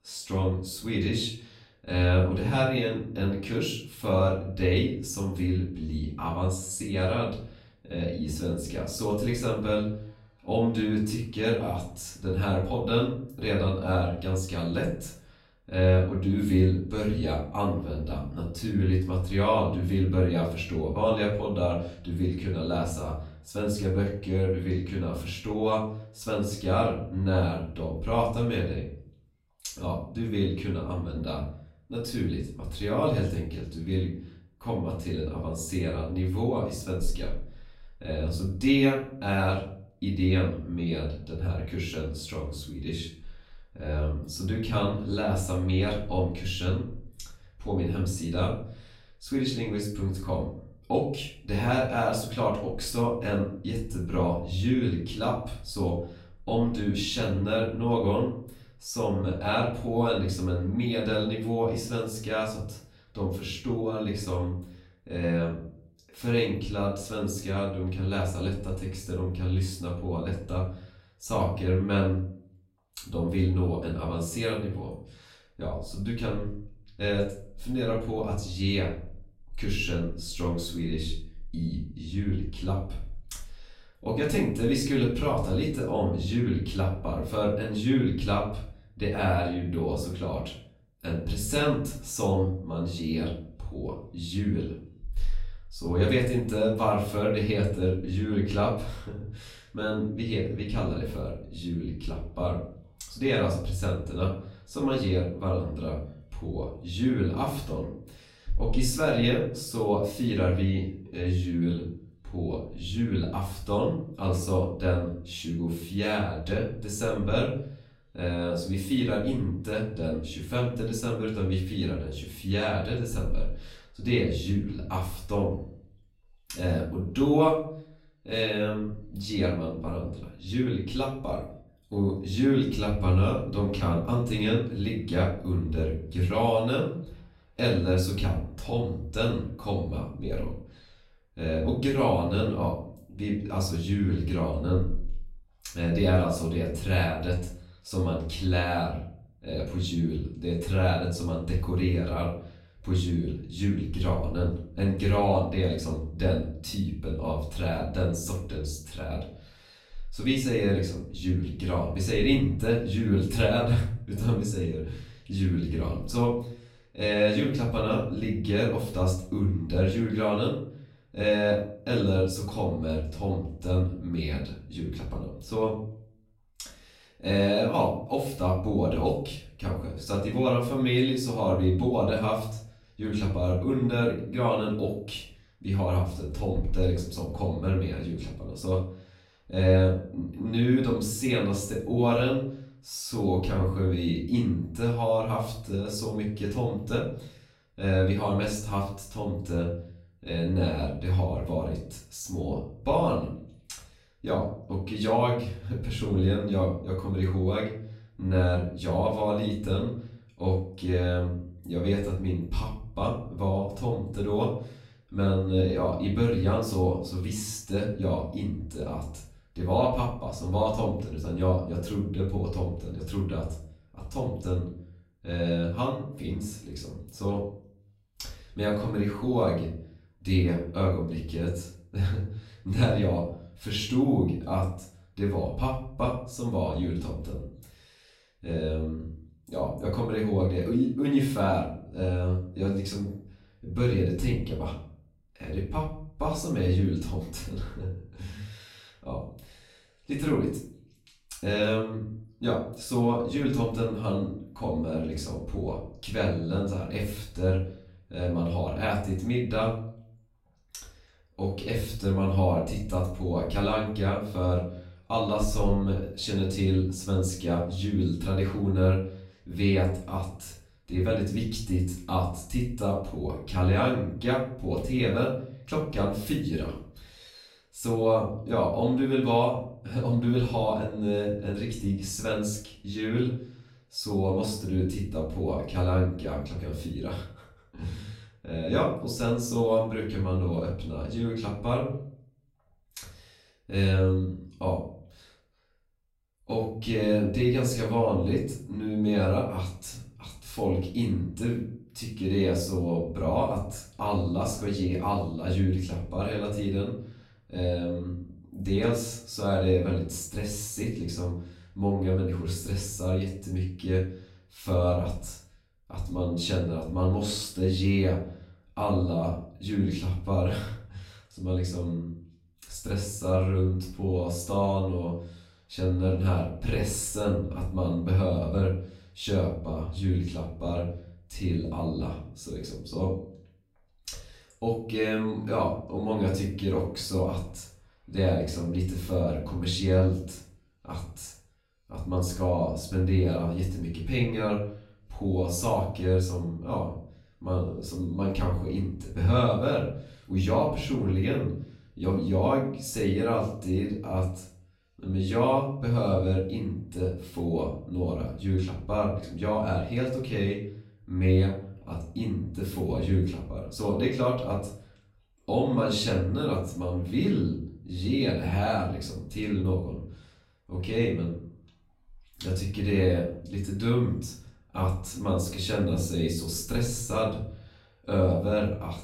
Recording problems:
off-mic speech; far
room echo; noticeable; dies away in 0.5 s

